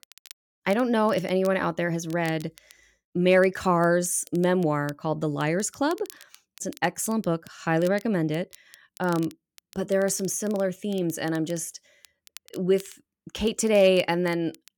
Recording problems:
crackle, like an old record; faint; 25 dB below the speech

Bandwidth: 17.5 kHz